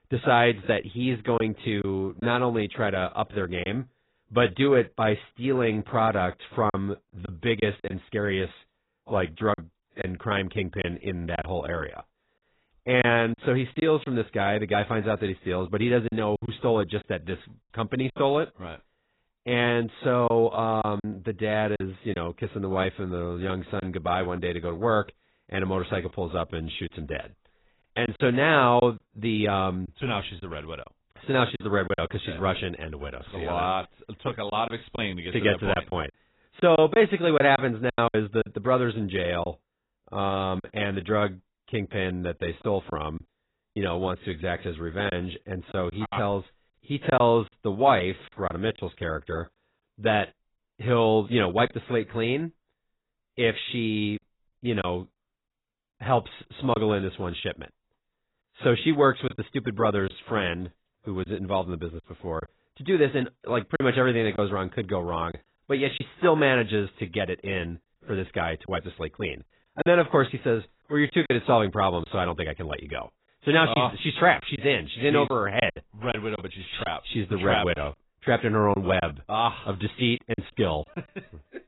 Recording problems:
garbled, watery; badly; nothing above 4 kHz
choppy; occasionally; 4% of the speech affected

